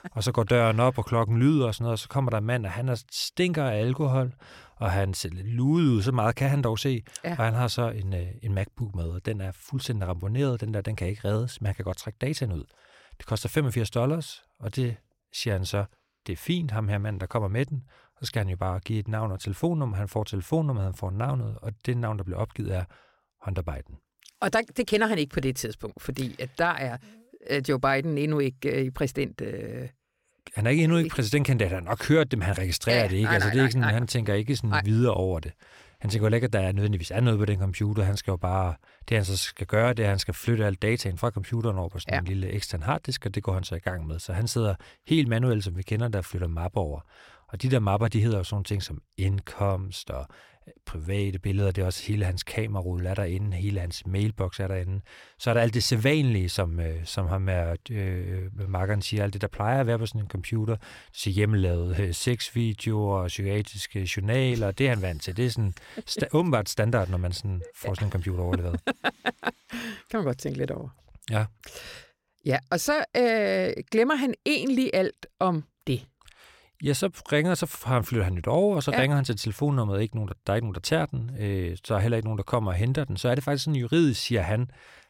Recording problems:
none

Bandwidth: 16.5 kHz